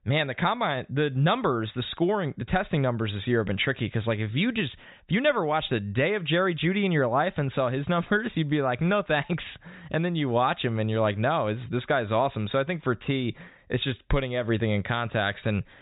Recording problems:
high frequencies cut off; severe; nothing above 4 kHz

